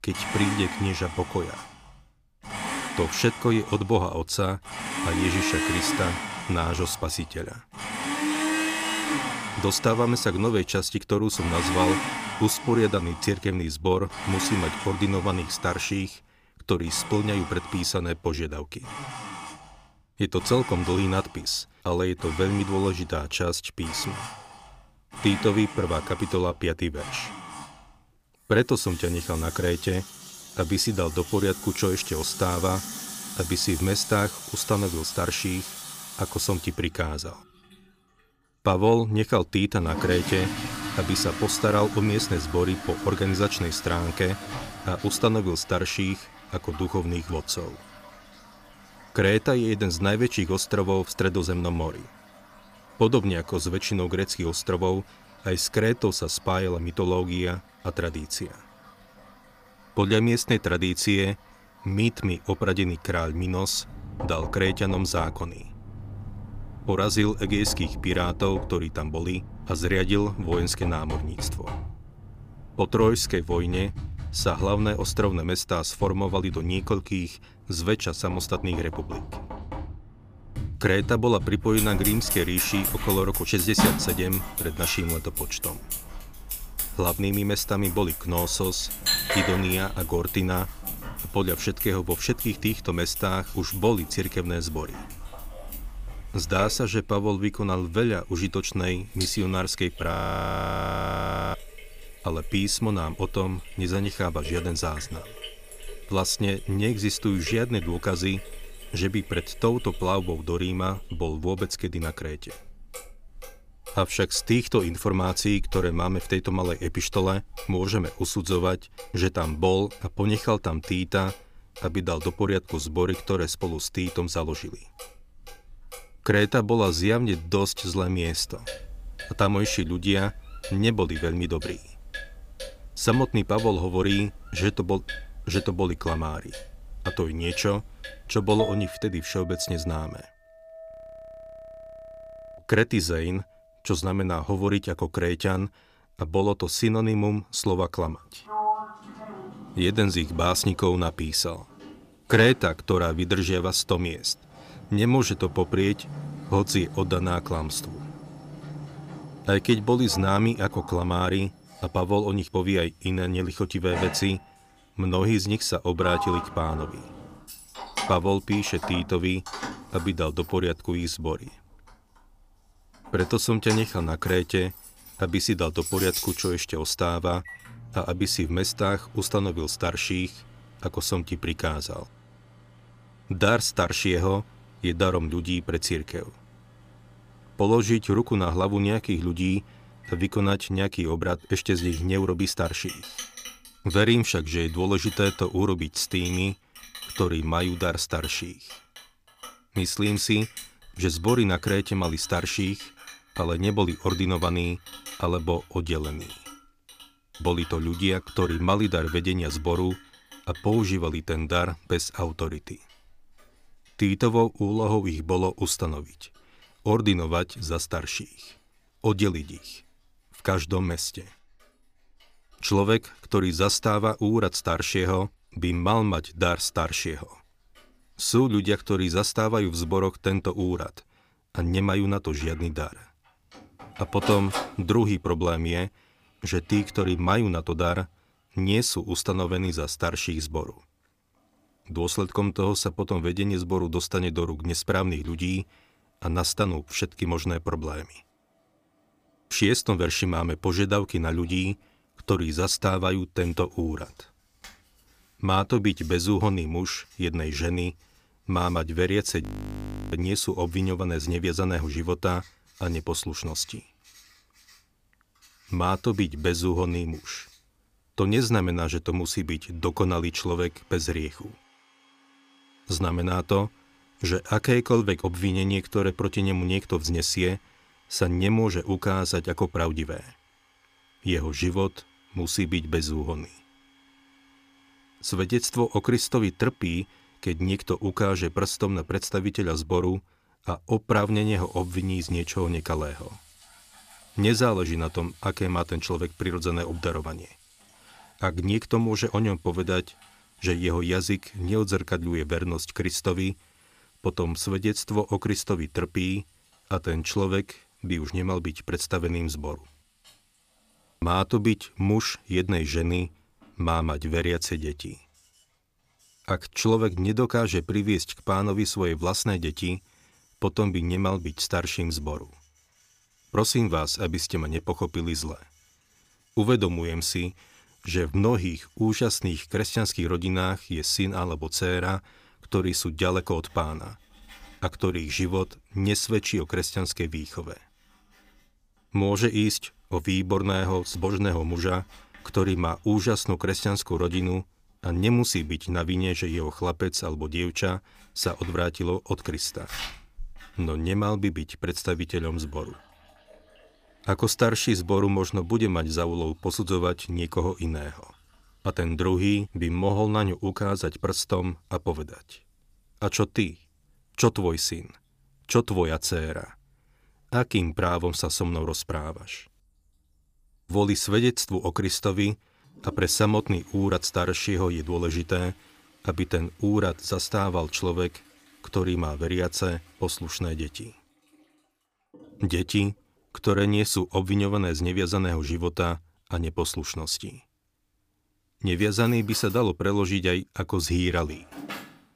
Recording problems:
household noises; loud; throughout; 9 dB below the speech
audio freezing; at 1:40 for 1.5 s, at 2:21 for 1.5 s and at 4:19 for 0.5 s

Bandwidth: 15 kHz